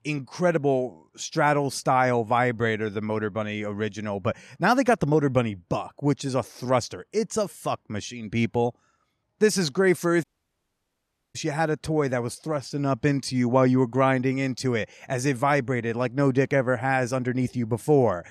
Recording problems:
audio cutting out; at 10 s for 1 s

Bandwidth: 13.5 kHz